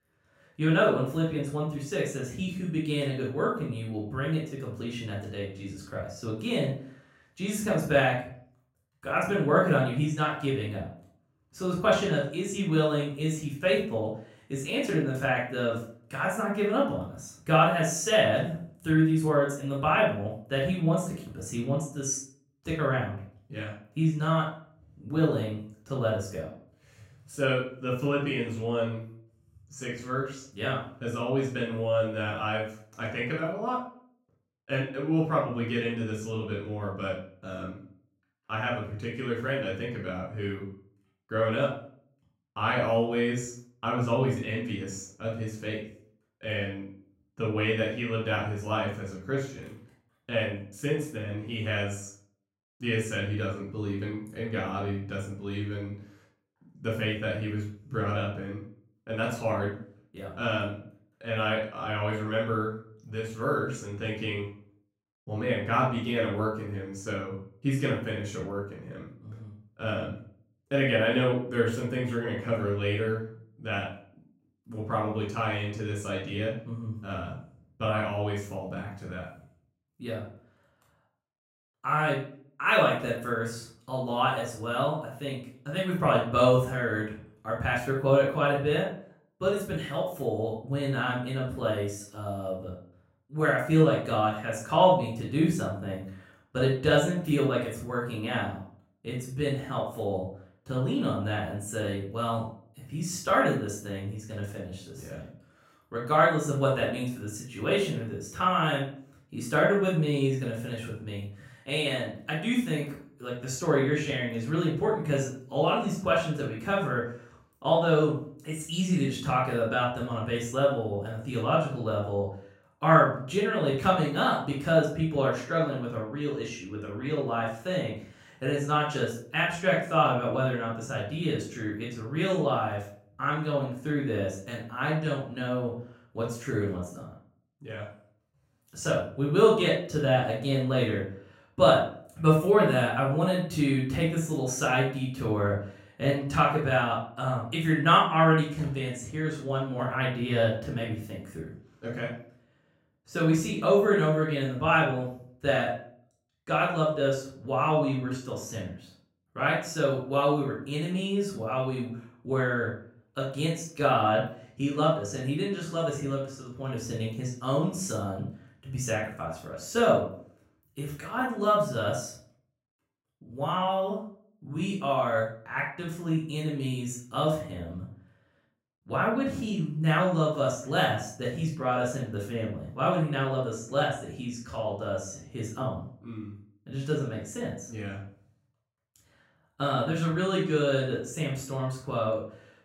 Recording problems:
off-mic speech; far
room echo; noticeable; dies away in 0.4 s

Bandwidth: 16 kHz